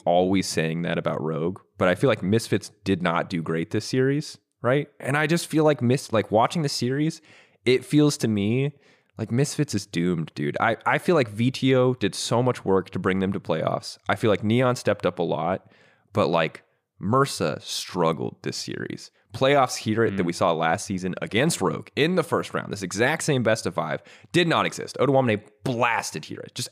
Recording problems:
none

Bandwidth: 15 kHz